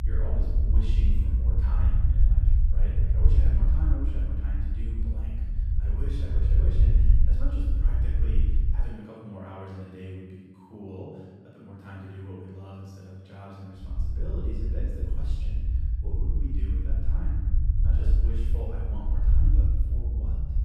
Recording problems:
room echo; strong; dies away in 1.3 s
off-mic speech; far
low rumble; loud; until 9 s and from 14 s on; 1 dB below the speech

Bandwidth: 14.5 kHz